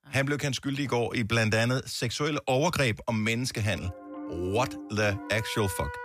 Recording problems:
background music; noticeable; from 3.5 s on; 15 dB below the speech

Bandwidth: 14.5 kHz